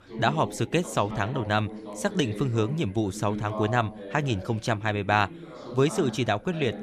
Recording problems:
background chatter; noticeable; throughout; 2 voices, 10 dB below the speech

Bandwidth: 14 kHz